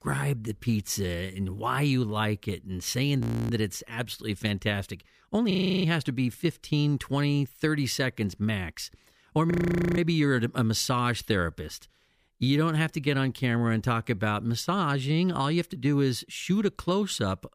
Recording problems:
audio freezing; at 3 s, at 5.5 s and at 9.5 s

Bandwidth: 15 kHz